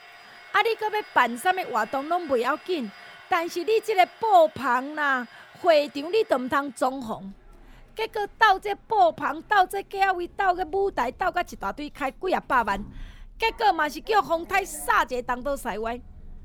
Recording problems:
household noises; faint; throughout; 25 dB below the speech

